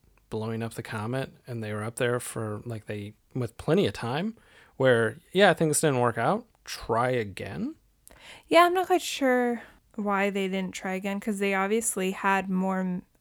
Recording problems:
none

